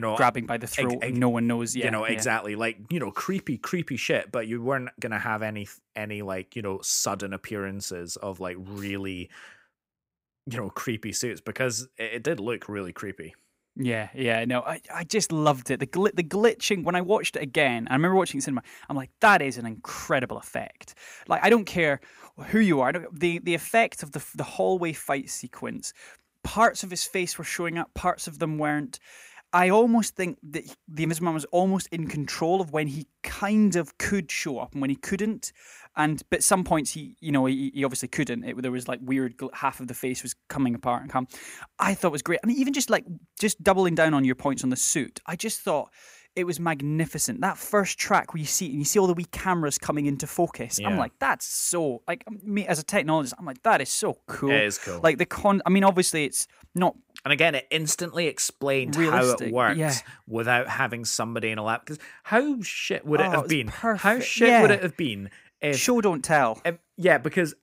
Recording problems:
abrupt cut into speech; at the start

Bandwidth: 15.5 kHz